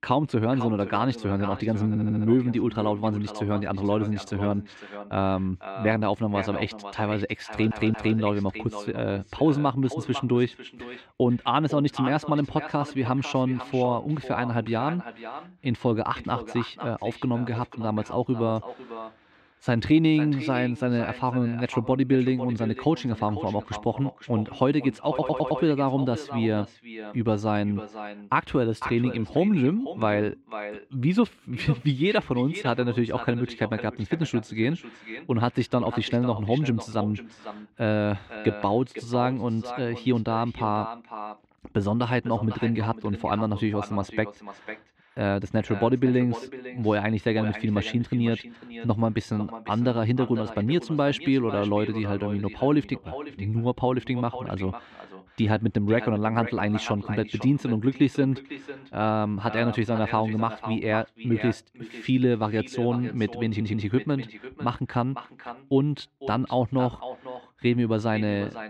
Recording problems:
echo of what is said; noticeable; throughout; 500 ms later, 15 dB below the speech
muffled; slightly; fading above 3 kHz
audio stuttering; 4 times, first at 2 s

